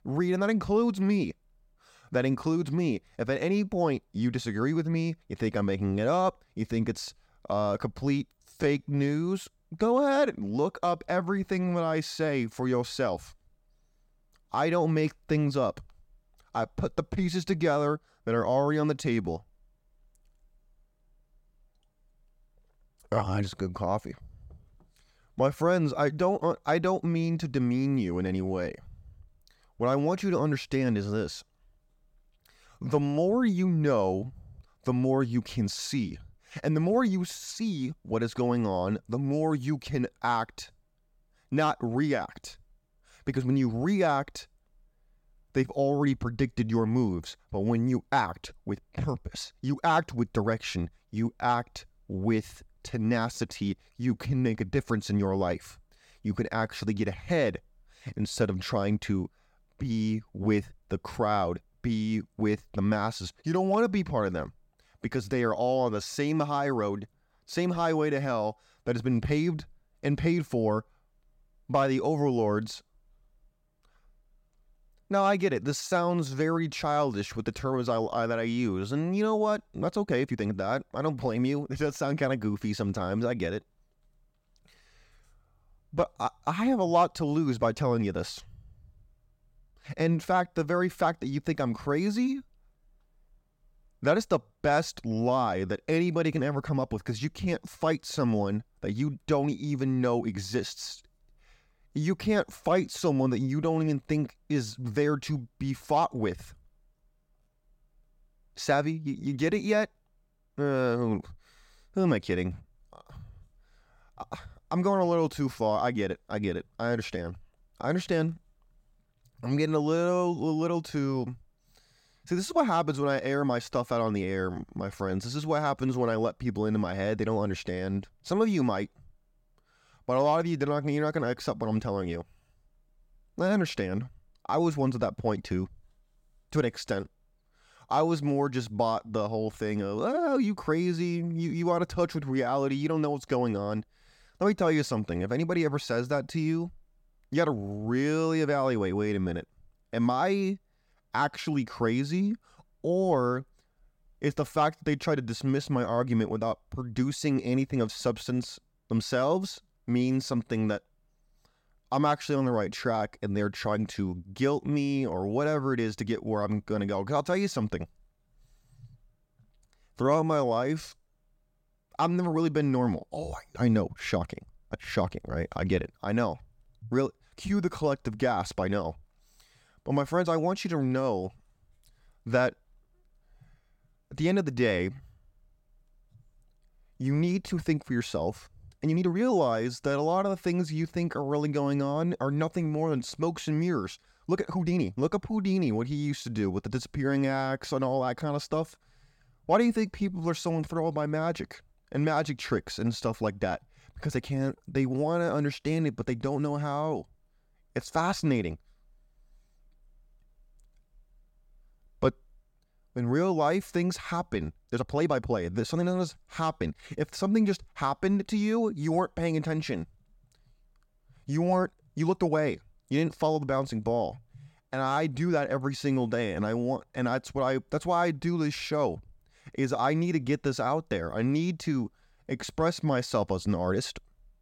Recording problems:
uneven, jittery; strongly; from 8.5 s to 3:45

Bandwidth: 16.5 kHz